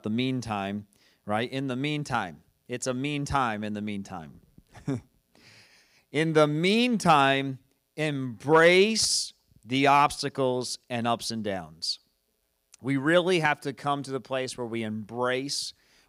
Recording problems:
none

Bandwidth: 15.5 kHz